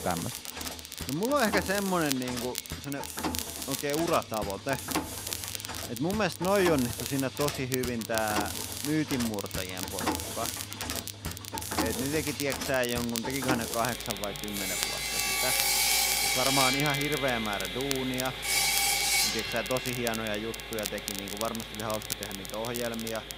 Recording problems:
machinery noise; very loud; throughout; as loud as the speech
crackle, like an old record; loud; 6 dB below the speech

